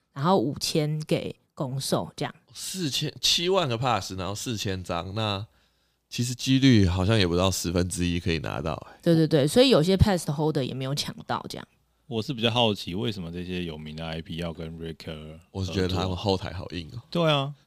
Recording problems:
none

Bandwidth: 15 kHz